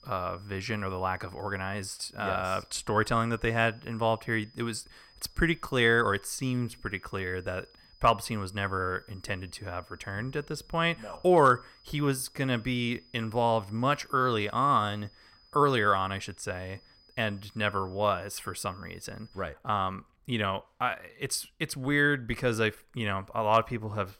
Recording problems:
high-pitched whine; faint; until 19 s; 5 kHz, 30 dB below the speech

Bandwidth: 16 kHz